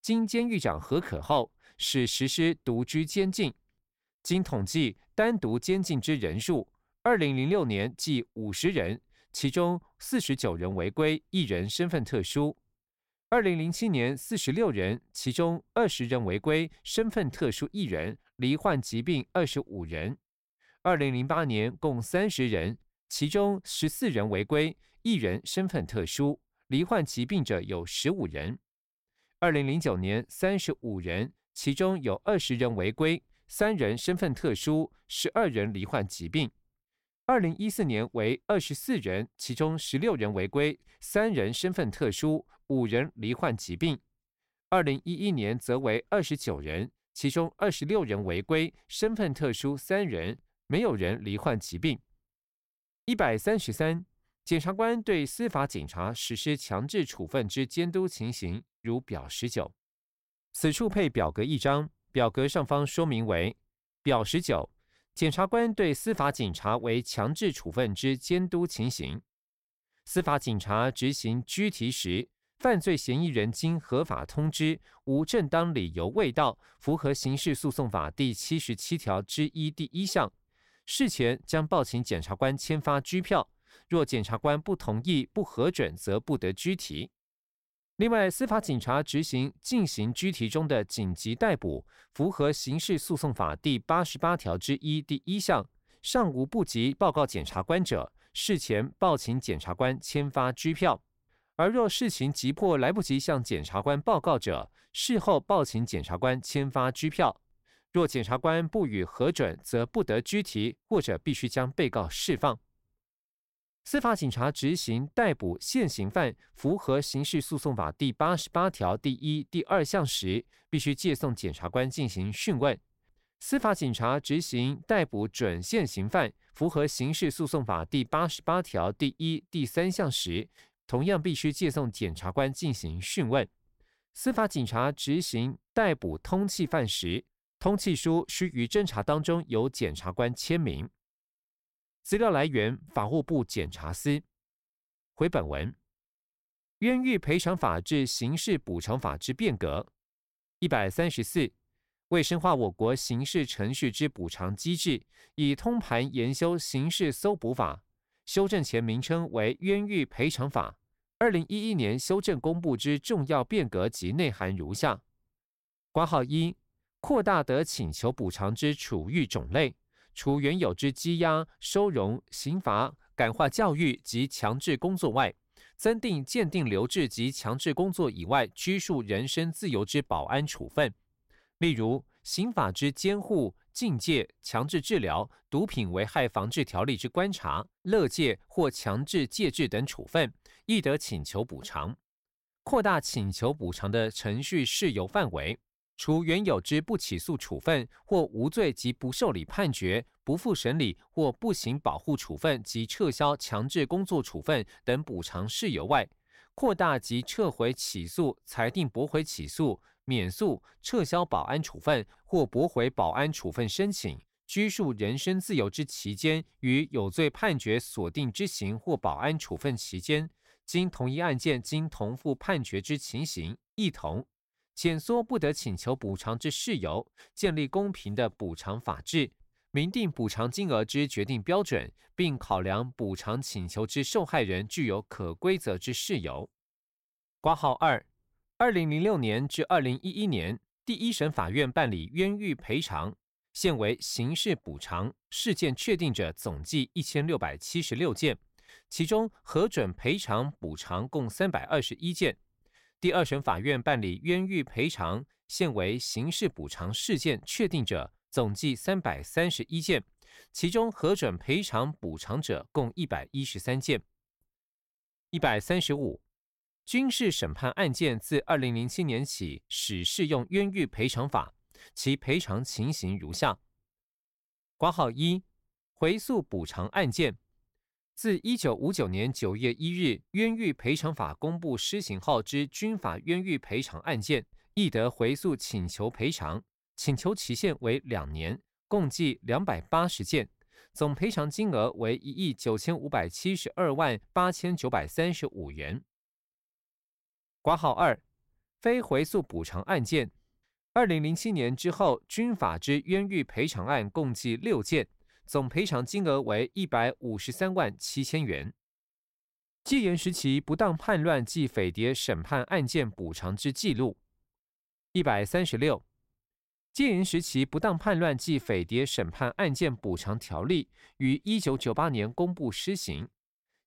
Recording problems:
none

